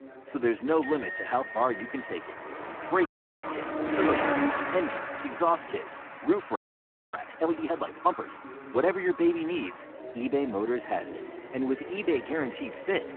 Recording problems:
phone-call audio; poor line
traffic noise; loud; throughout; 6 dB below the speech
household noises; noticeable; throughout; 10 dB below the speech
voice in the background; noticeable; throughout; 20 dB below the speech
audio freezing; at 3 s and at 6.5 s for 0.5 s

